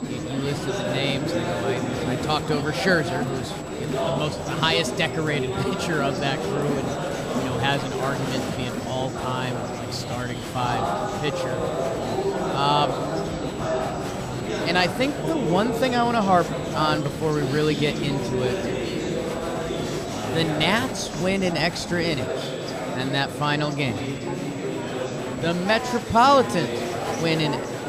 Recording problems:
murmuring crowd; loud; throughout; 3 dB below the speech
high-pitched whine; faint; throughout; 8 kHz, 25 dB below the speech

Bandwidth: 15 kHz